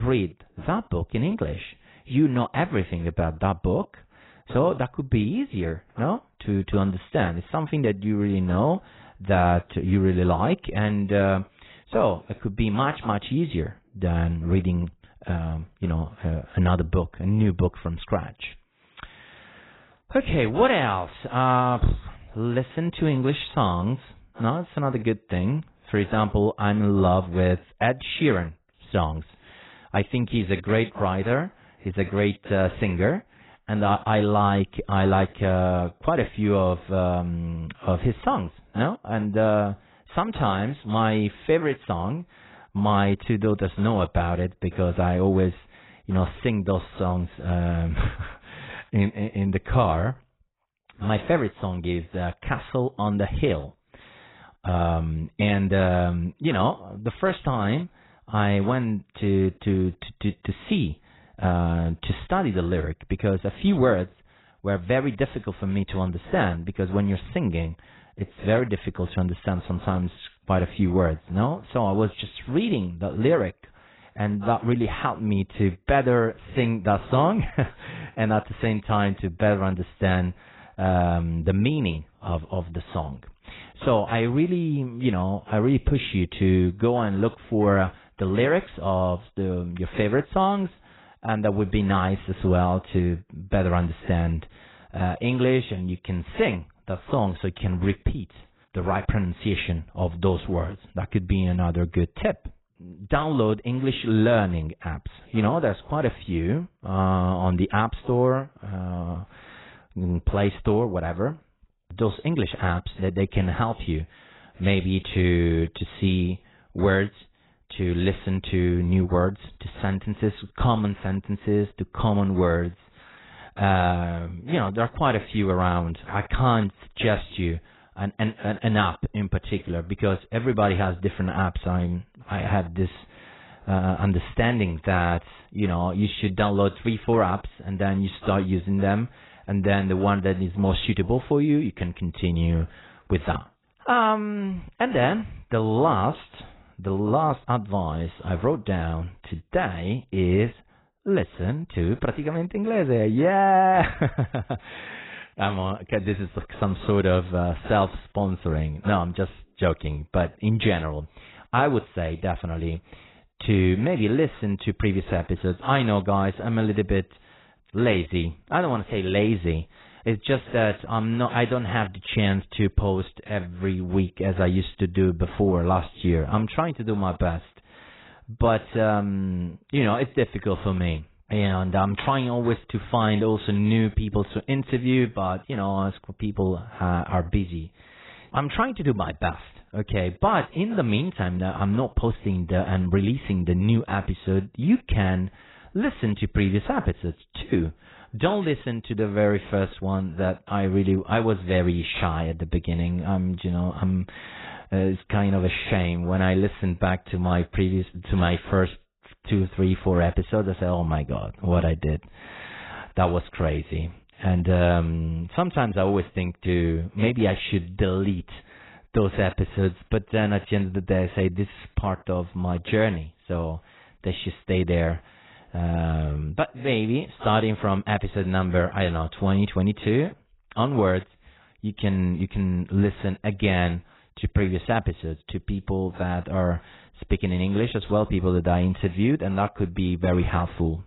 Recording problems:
garbled, watery; badly; nothing above 4 kHz
abrupt cut into speech; at the start

